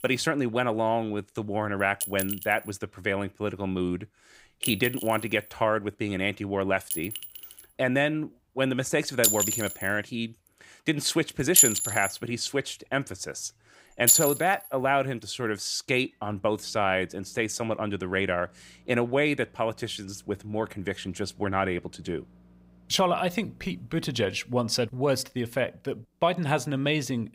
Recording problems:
household noises; very loud; throughout; 3 dB above the speech

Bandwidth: 15.5 kHz